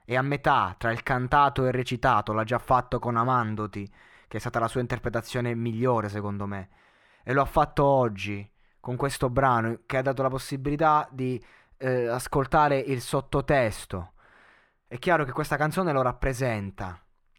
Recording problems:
muffled; slightly; fading above 3.5 kHz

